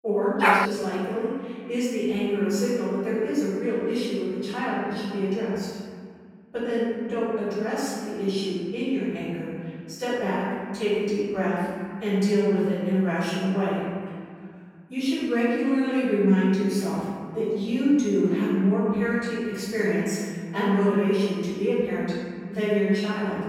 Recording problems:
room echo; strong; dies away in 2 s
off-mic speech; far
dog barking; loud; at 0.5 s; peak 5 dB above the speech

